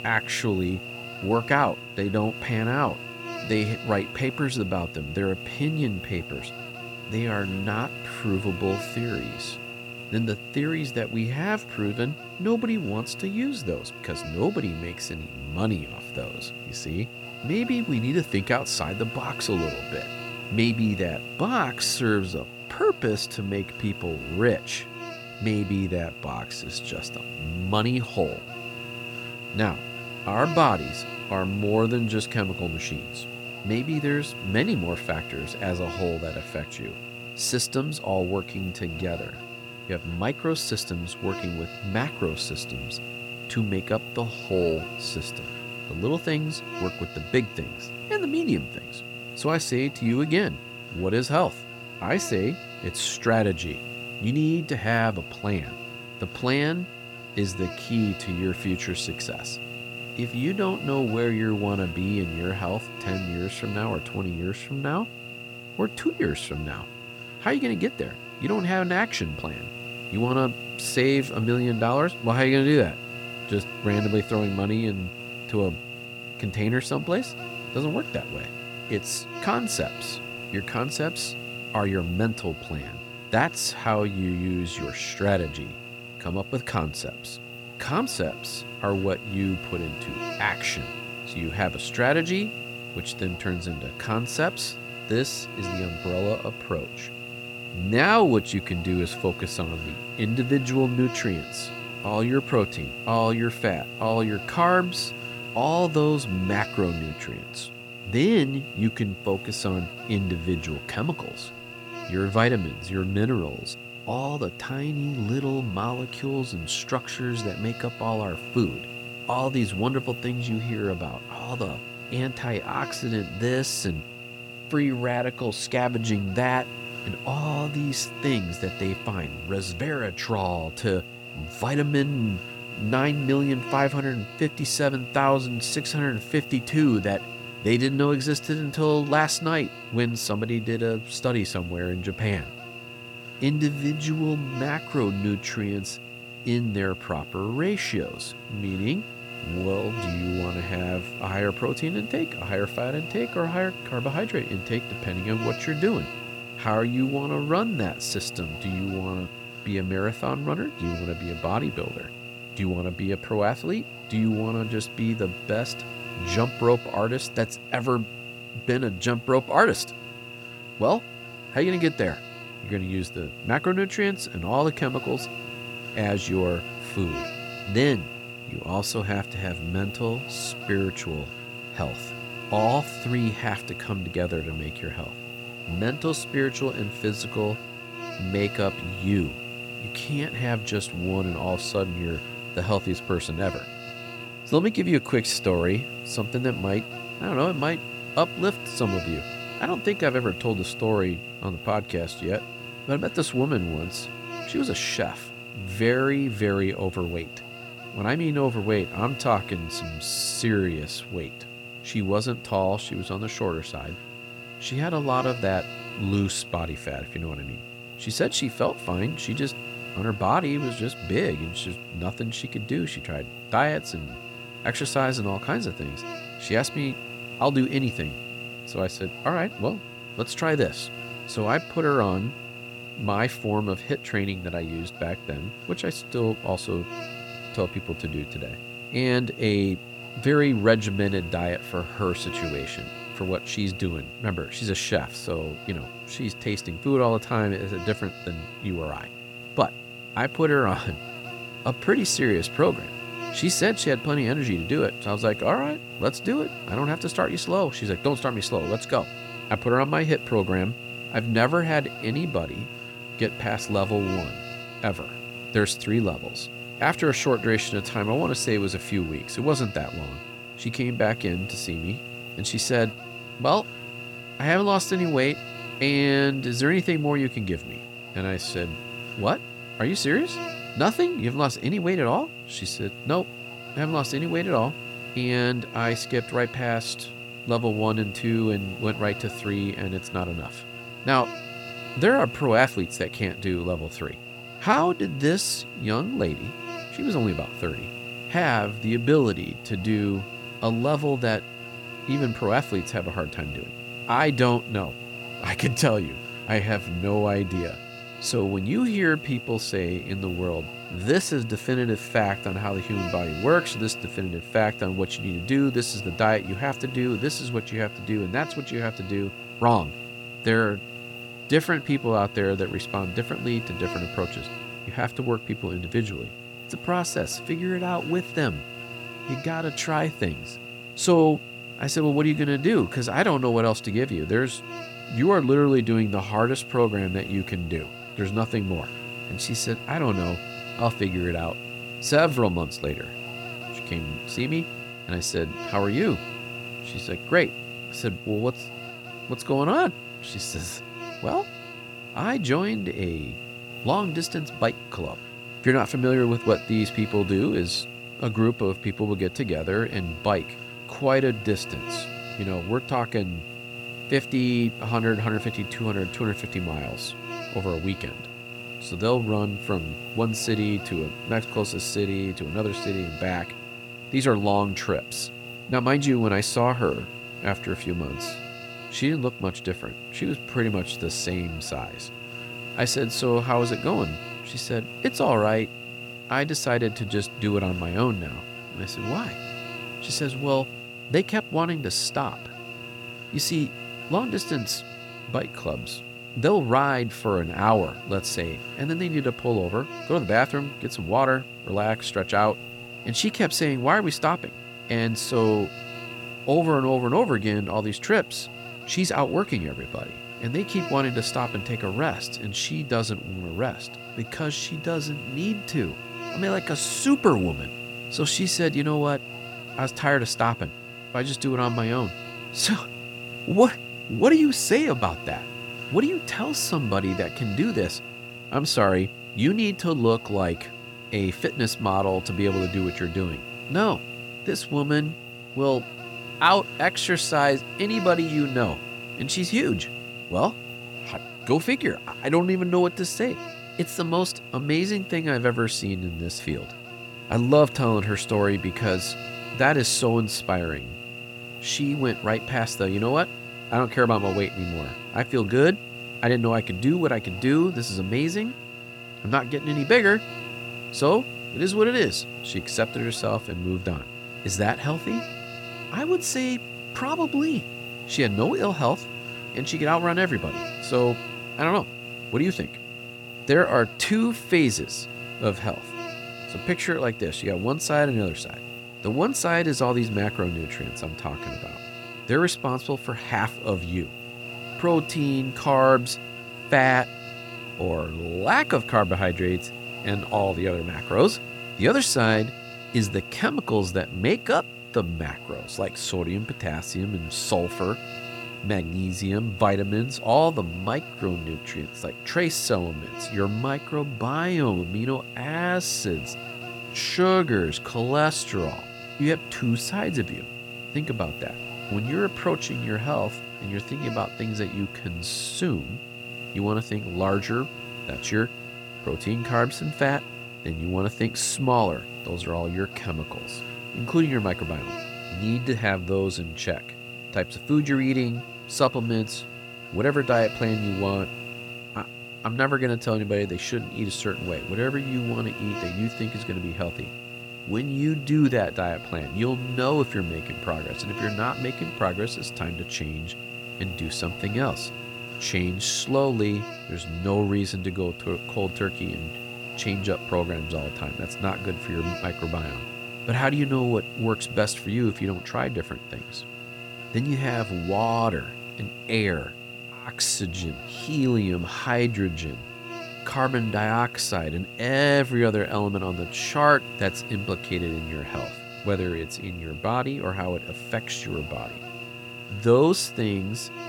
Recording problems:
electrical hum; loud; throughout; 60 Hz, 8 dB below the speech

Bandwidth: 17 kHz